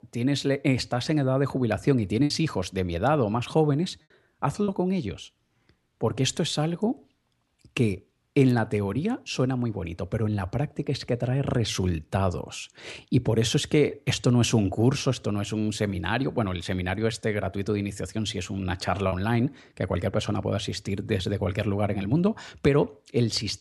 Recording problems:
choppy; occasionally; 1% of the speech affected

